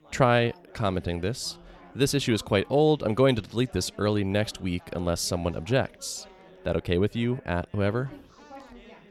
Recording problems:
background chatter; faint; throughout; 4 voices, 25 dB below the speech

